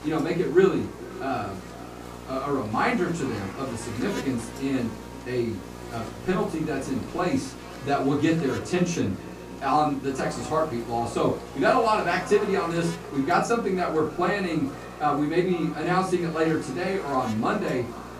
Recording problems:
off-mic speech; far
echo of what is said; noticeable; throughout; 450 ms later, 15 dB below the speech
room echo; slight; dies away in 0.3 s
electrical hum; noticeable; throughout; 60 Hz, 15 dB below the speech
chatter from many people; faint; throughout; 30 dB below the speech

